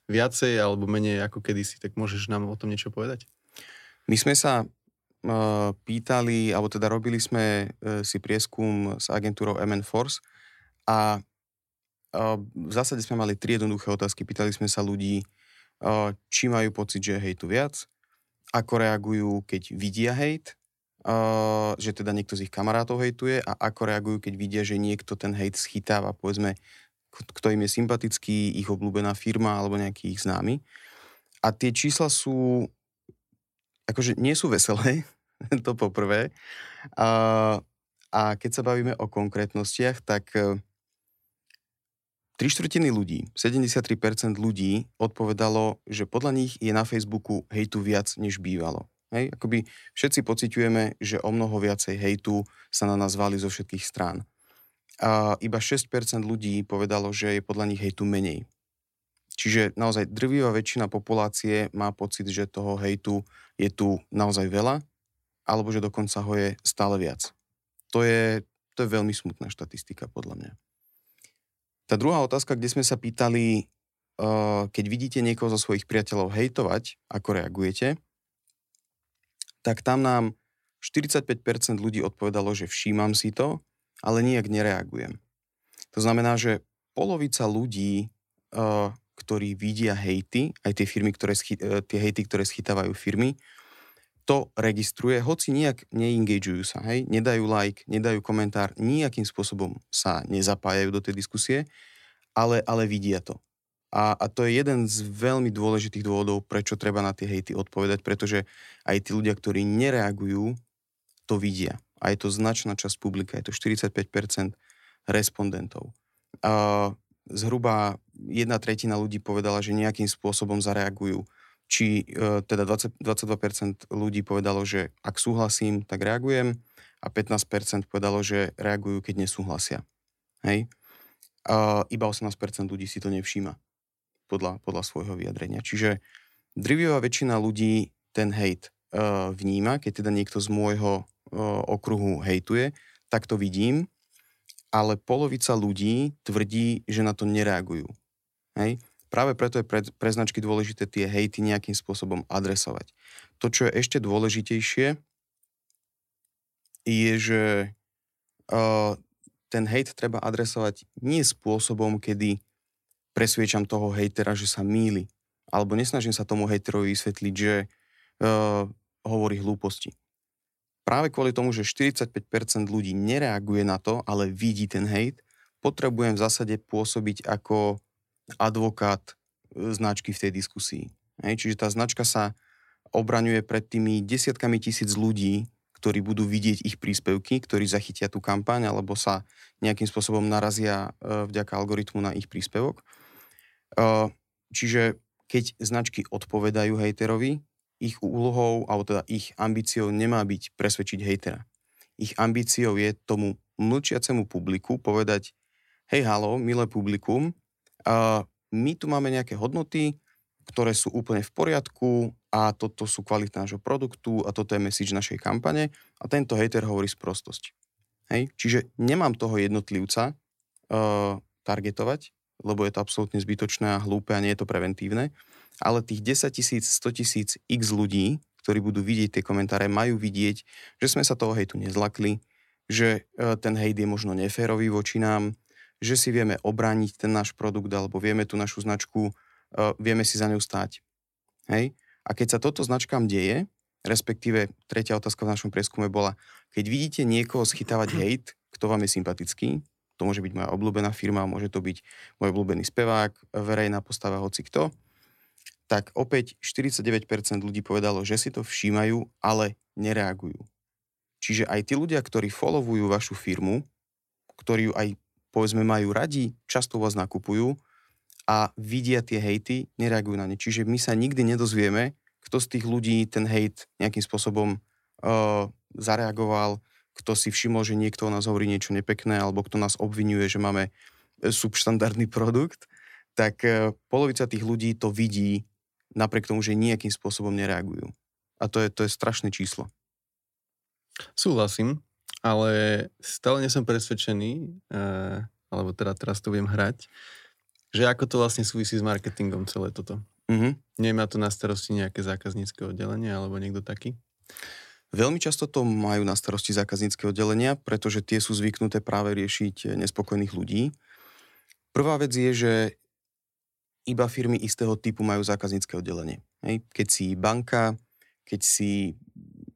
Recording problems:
none

